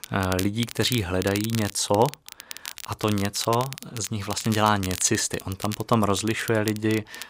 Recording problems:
crackle, like an old record; noticeable; 10 dB below the speech

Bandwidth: 15.5 kHz